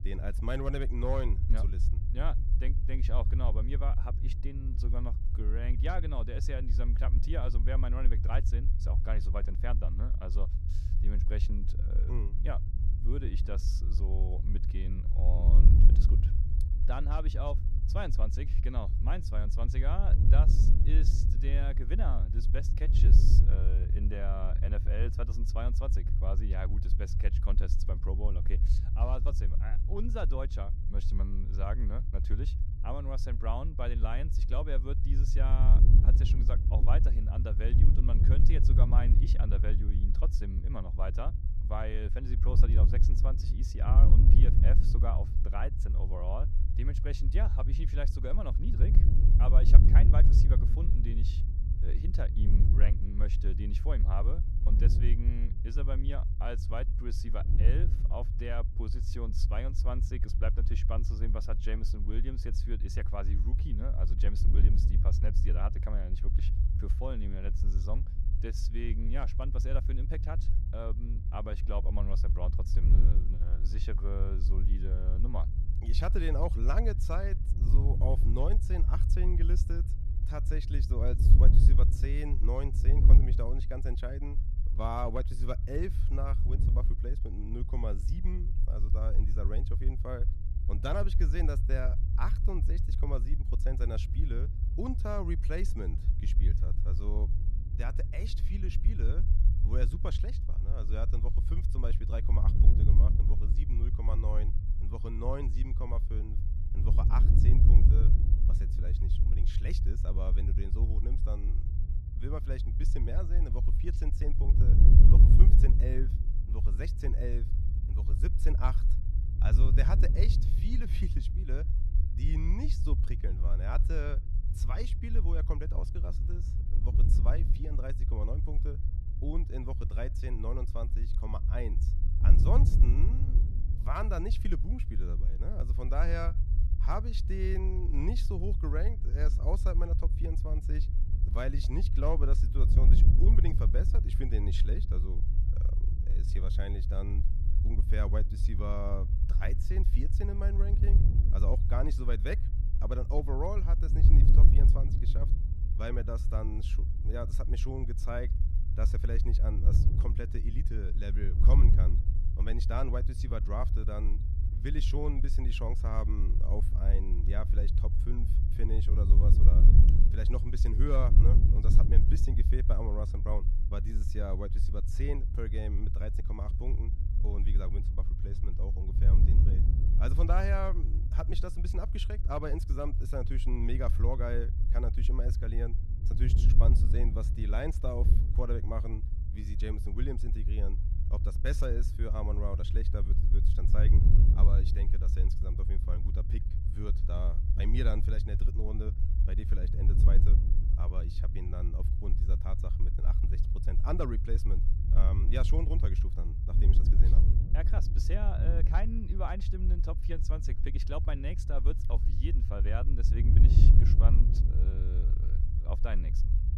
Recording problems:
wind noise on the microphone; heavy; 7 dB below the speech
low rumble; noticeable; throughout; 10 dB below the speech

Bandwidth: 14 kHz